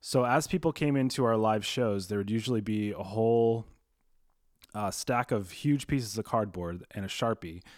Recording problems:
none

